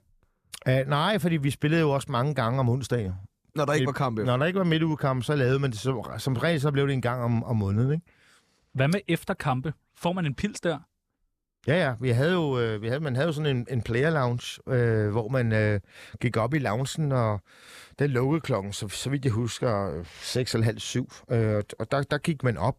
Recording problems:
none

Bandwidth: 14.5 kHz